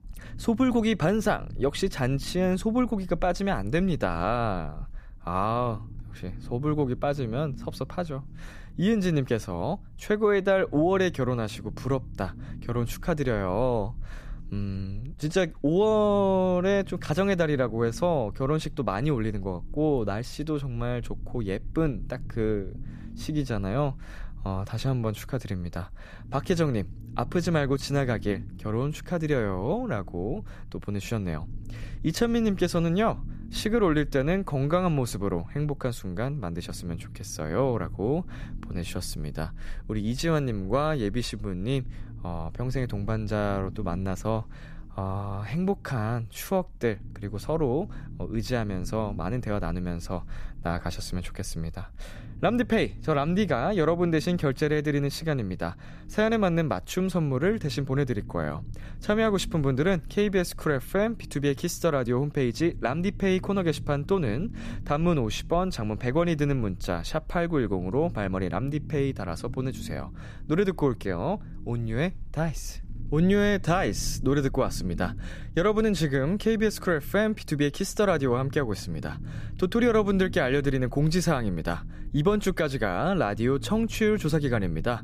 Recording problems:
low rumble; faint; throughout; 25 dB below the speech

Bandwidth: 14.5 kHz